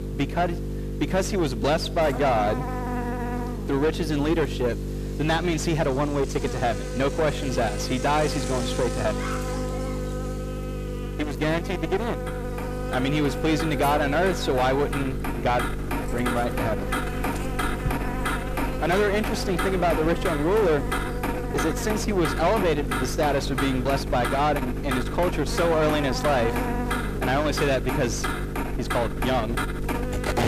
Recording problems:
distortion; heavy; 7 dB below the speech
traffic noise; loud; throughout; 7 dB below the speech
electrical hum; noticeable; throughout; 50 Hz, 10 dB below the speech

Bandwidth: 14.5 kHz